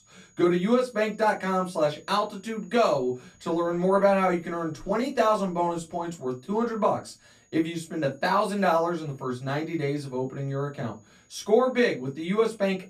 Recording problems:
off-mic speech; far
room echo; very slight; dies away in 0.2 s
high-pitched whine; faint; throughout; 6.5 kHz, 35 dB below the speech

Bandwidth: 14.5 kHz